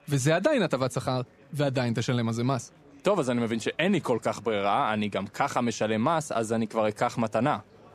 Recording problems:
chatter from many people; faint; throughout; 30 dB below the speech

